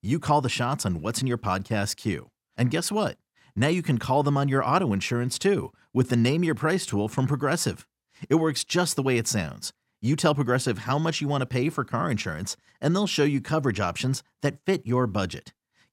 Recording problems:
none

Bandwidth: 16 kHz